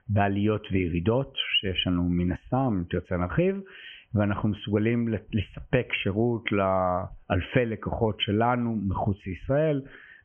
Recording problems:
high frequencies cut off; severe; nothing above 3 kHz
squashed, flat; heavily

